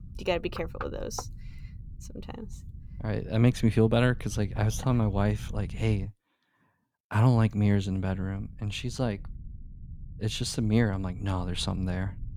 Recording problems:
low rumble; faint; until 6 s and from 7.5 s on; 25 dB below the speech

